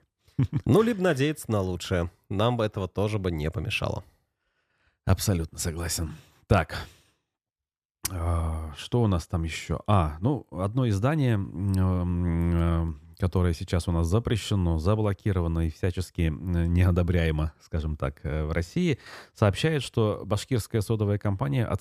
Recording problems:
none

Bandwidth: 14.5 kHz